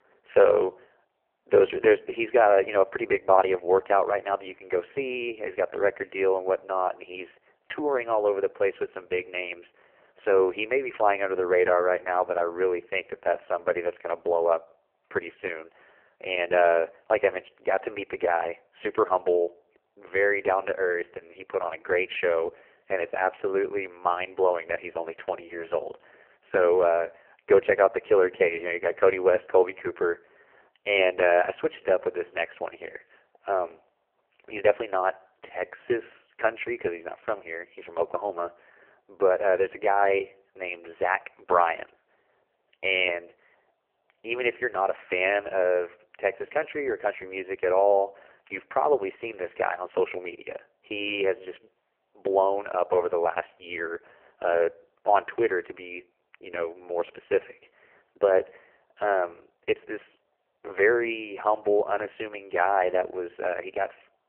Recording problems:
phone-call audio; poor line; nothing above 3 kHz

